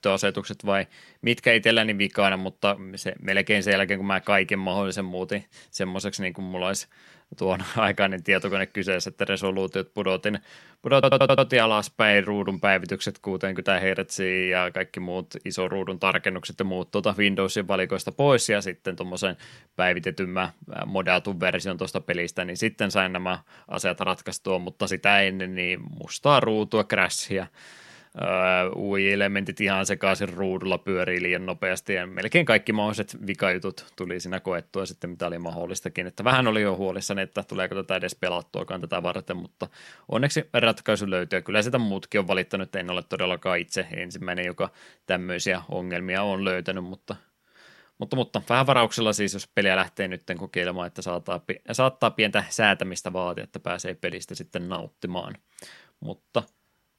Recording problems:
audio stuttering; at 11 s

